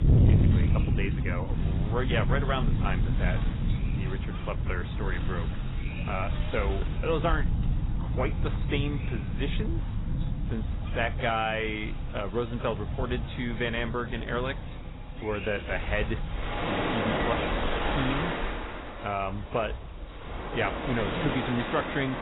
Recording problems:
garbled, watery; badly; nothing above 4 kHz
distortion; slight; 10 dB below the speech
rain or running water; very loud; throughout; 2 dB above the speech
wind noise on the microphone; occasional gusts; 15 dB below the speech

